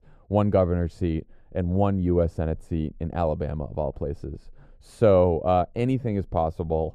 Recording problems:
muffled; very; fading above 1 kHz

